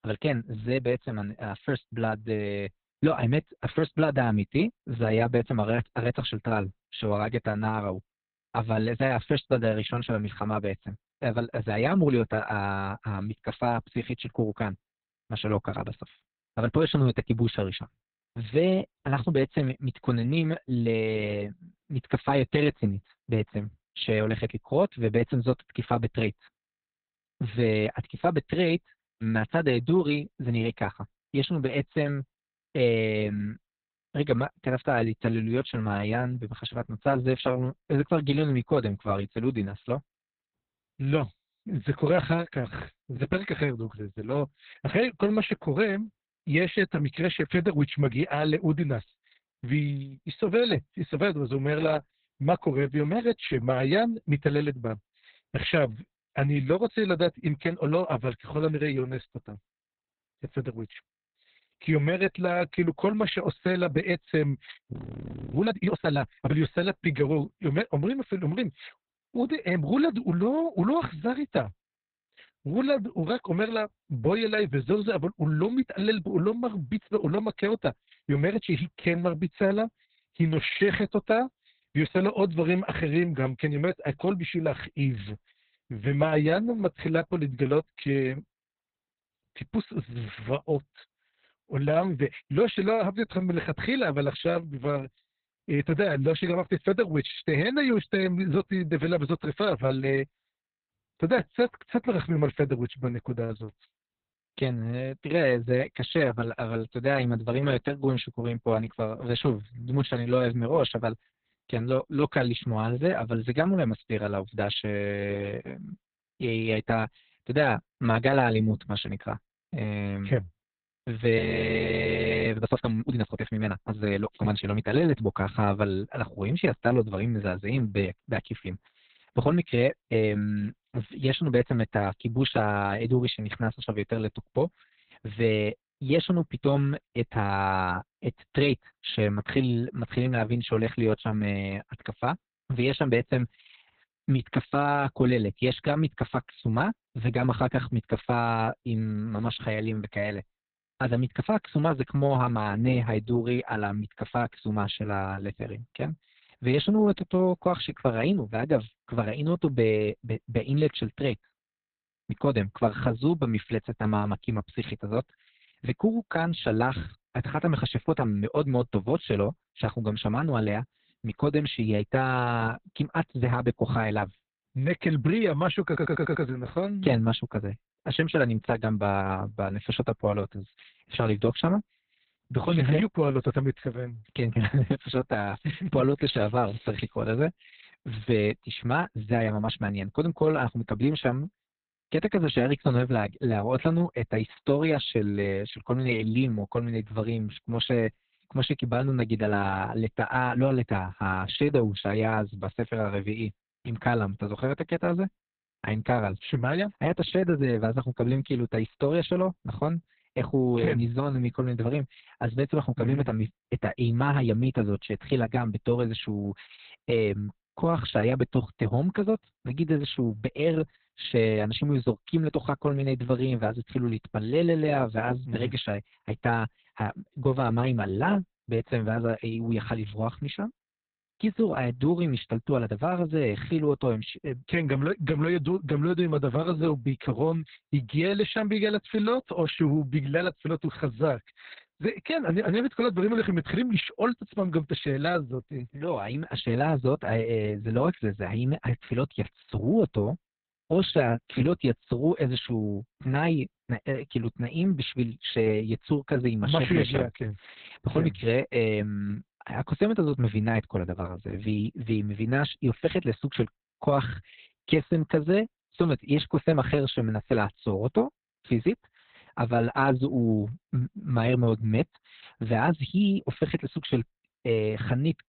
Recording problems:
garbled, watery; badly; nothing above 4 kHz
audio freezing; at 1:05 for 0.5 s and at 2:01 for 1 s
audio stuttering; at 2:56

